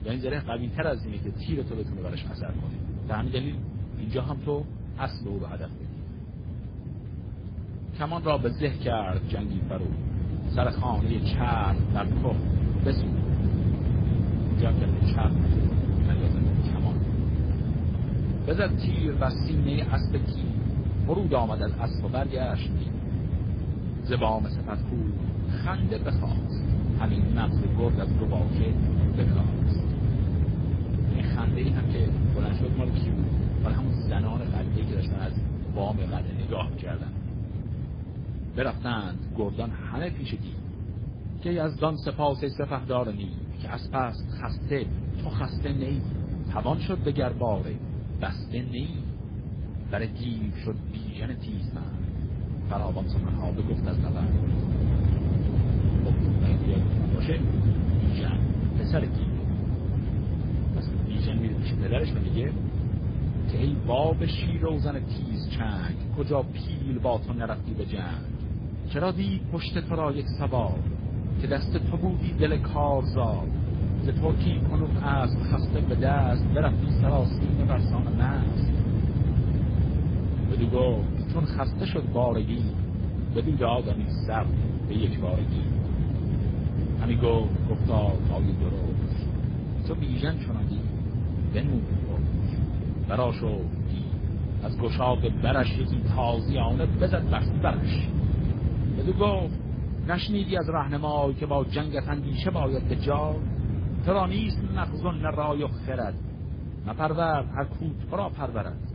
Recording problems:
garbled, watery; badly
low rumble; loud; throughout; 7 dB below the speech

